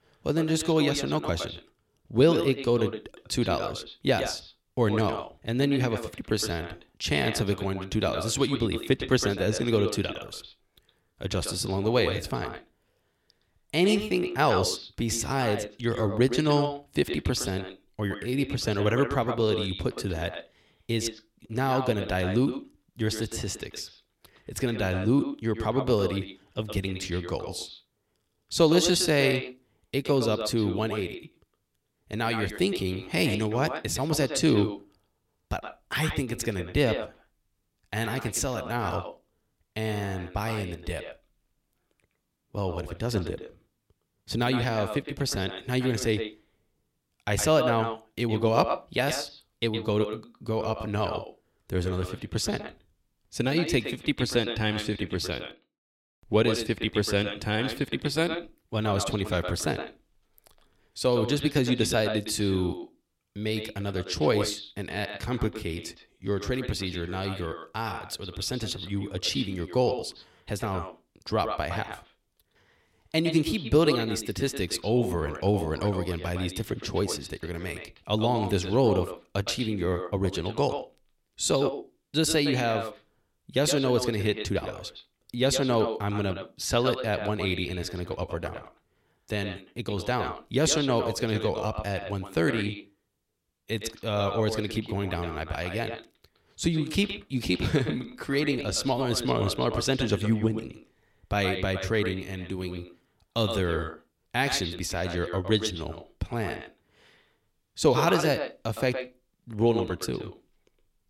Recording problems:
echo of what is said; strong; throughout; 110 ms later, 8 dB below the speech

